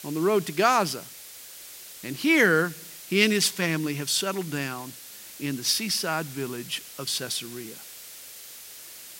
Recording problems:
hiss; noticeable; throughout; 15 dB below the speech

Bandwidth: 16 kHz